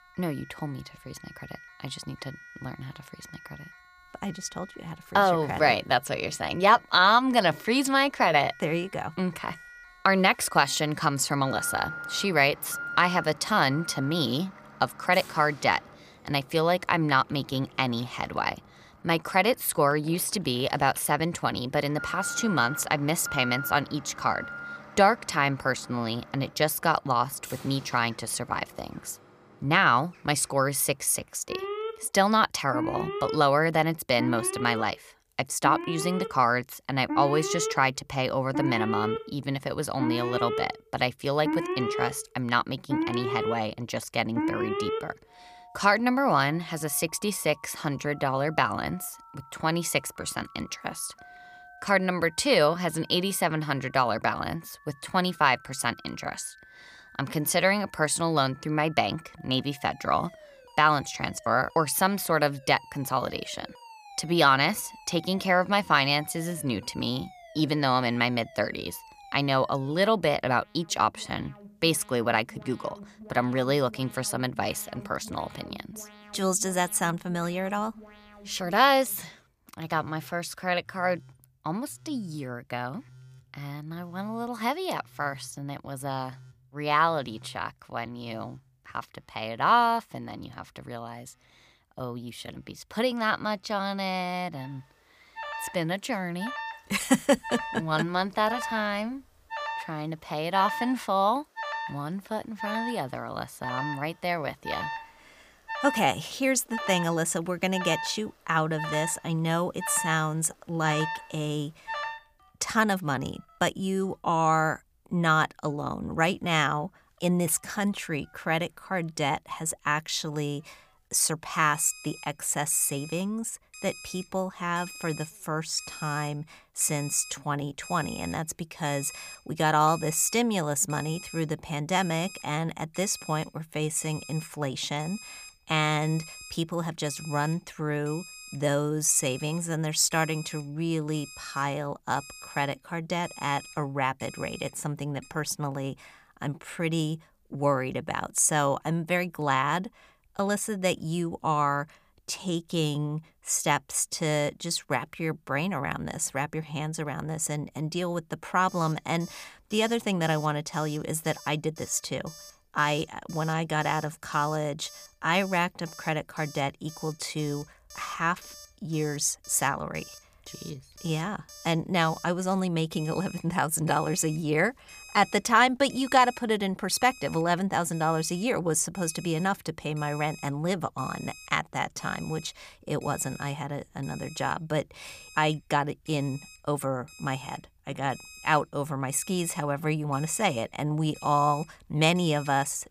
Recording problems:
alarms or sirens; noticeable; throughout; 15 dB below the speech

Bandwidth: 15 kHz